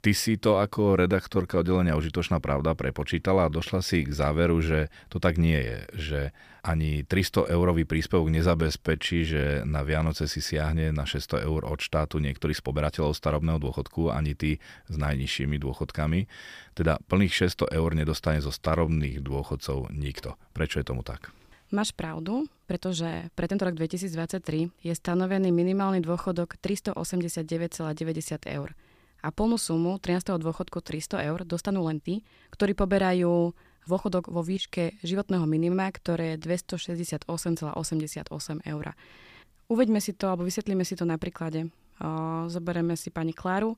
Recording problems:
uneven, jittery; strongly; from 0.5 to 43 s

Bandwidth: 15 kHz